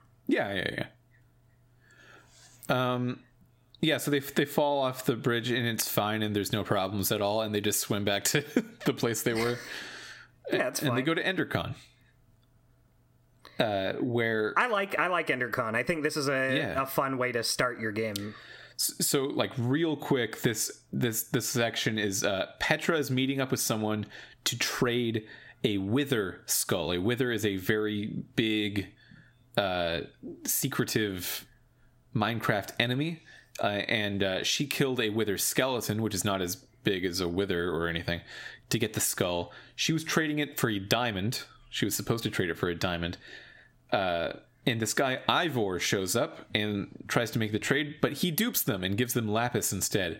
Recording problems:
squashed, flat; heavily

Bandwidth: 16 kHz